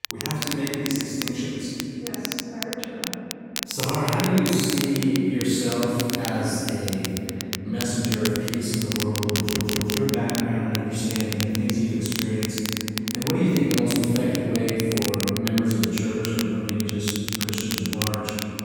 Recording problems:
room echo; strong; dies away in 3 s
off-mic speech; far
crackle, like an old record; very faint; 5 dB below the speech
audio stuttering; at 9.5 s

